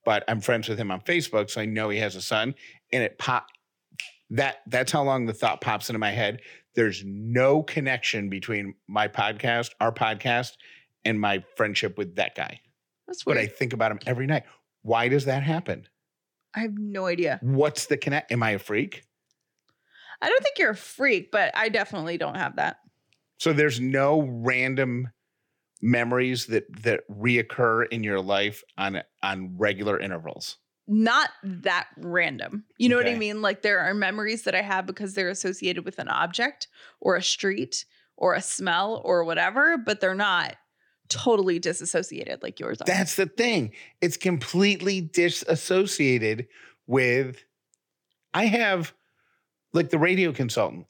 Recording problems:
none

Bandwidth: 18 kHz